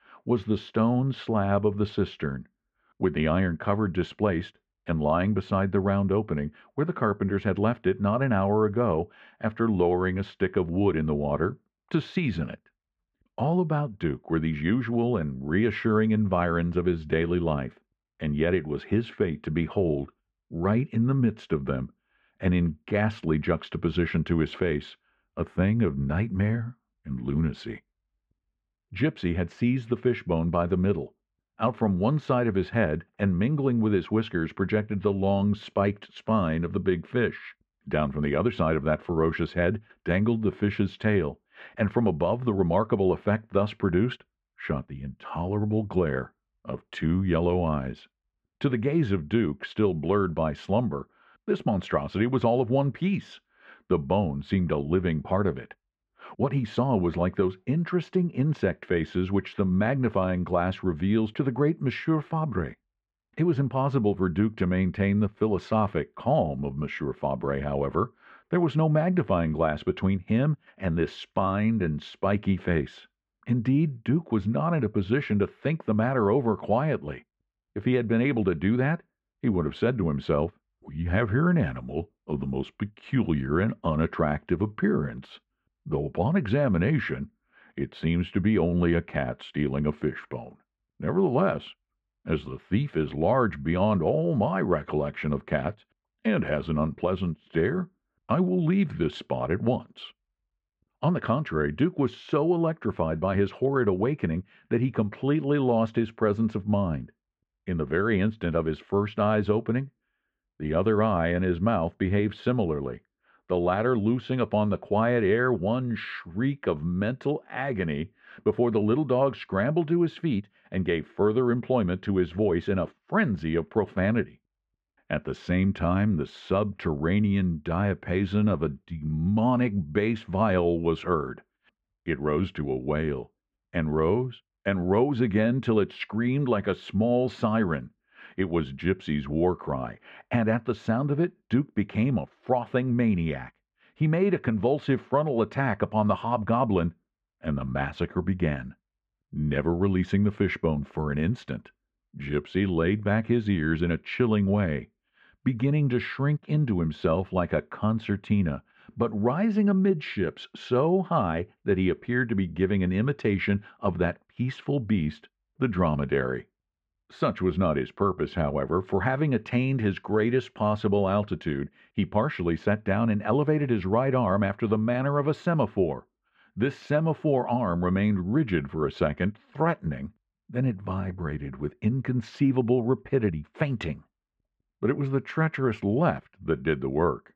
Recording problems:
muffled; very; fading above 1.5 kHz

